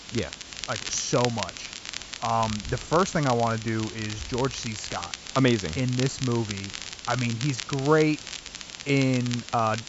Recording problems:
high frequencies cut off; noticeable; nothing above 8 kHz
crackle, like an old record; loud; 10 dB below the speech
hiss; noticeable; throughout; 15 dB below the speech

